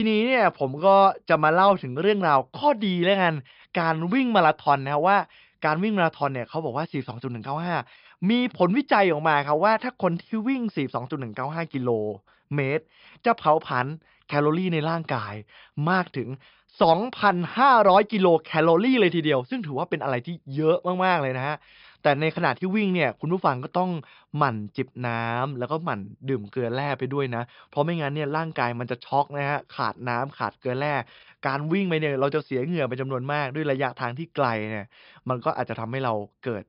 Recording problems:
high frequencies cut off; noticeable; nothing above 5.5 kHz
abrupt cut into speech; at the start

